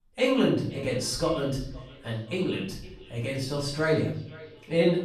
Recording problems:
off-mic speech; far
room echo; noticeable; dies away in 0.6 s
echo of what is said; faint; throughout; 510 ms later, 20 dB below the speech

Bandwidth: 14 kHz